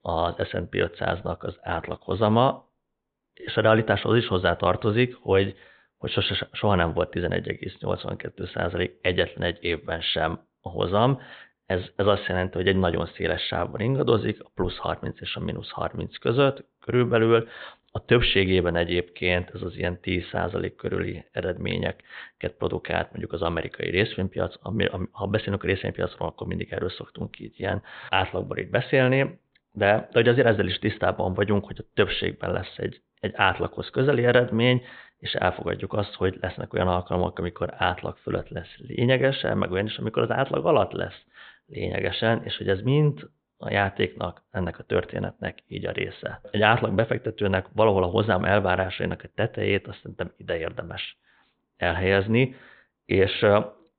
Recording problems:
high frequencies cut off; severe; nothing above 4 kHz

